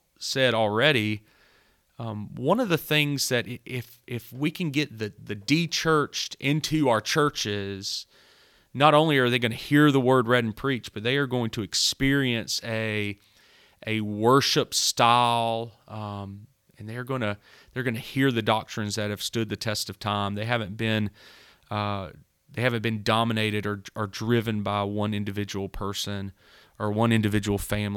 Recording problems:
abrupt cut into speech; at the end

